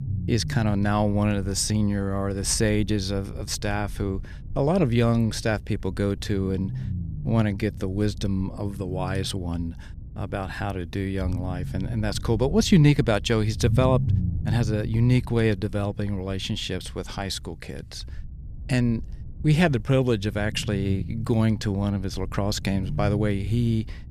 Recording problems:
low rumble; noticeable; throughout; 20 dB below the speech

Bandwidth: 14.5 kHz